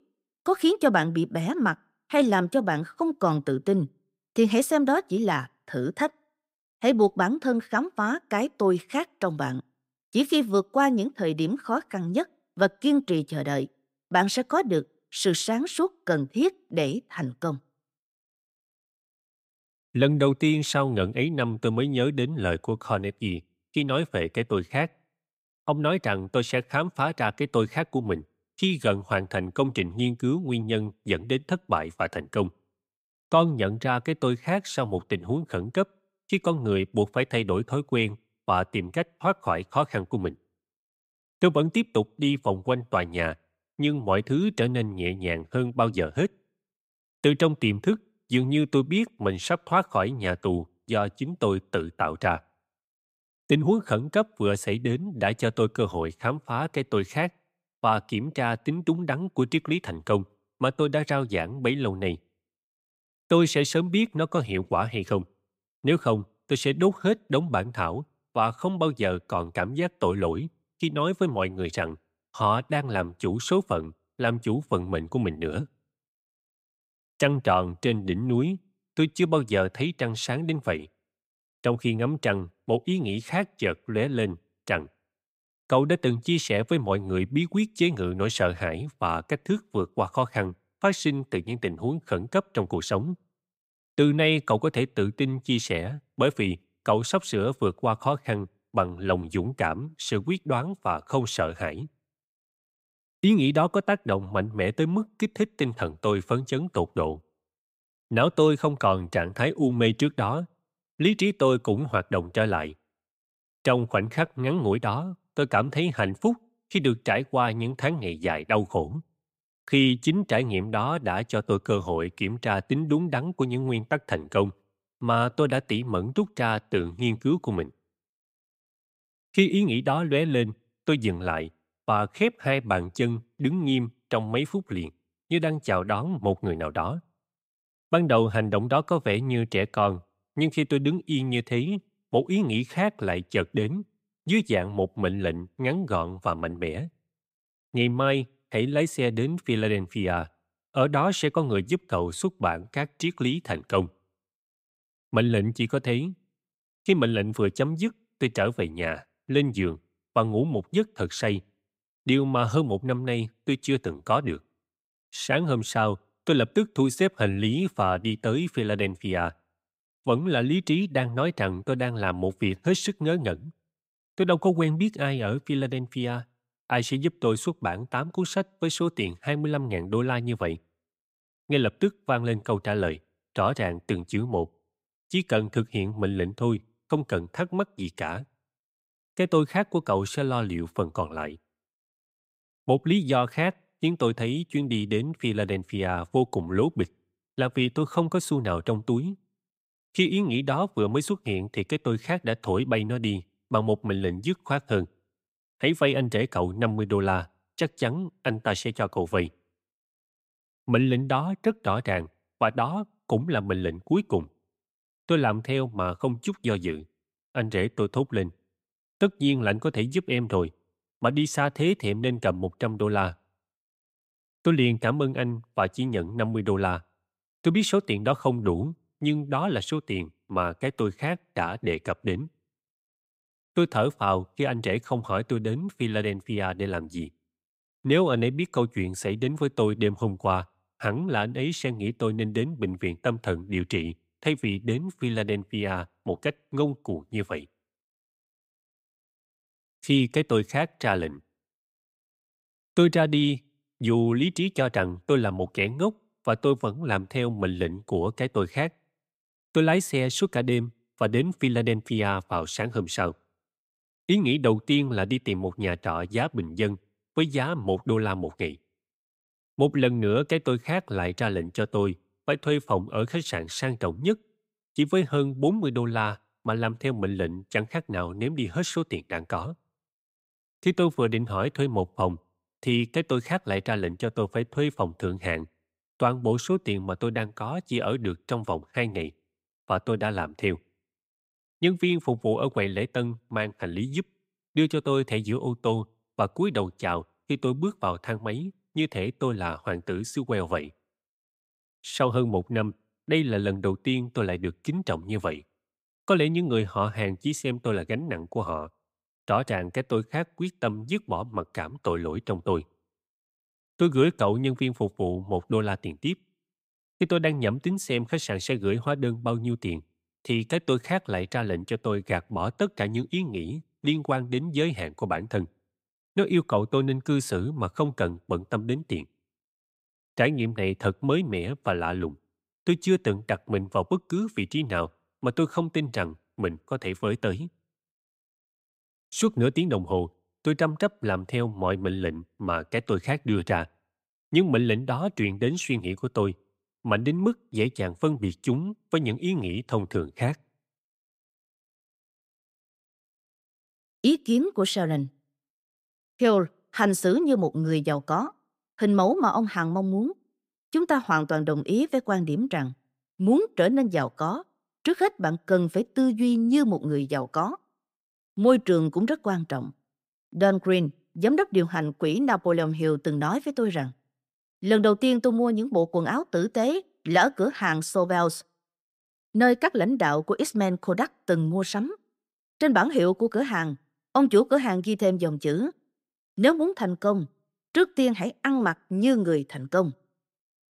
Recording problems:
none

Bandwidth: 15.5 kHz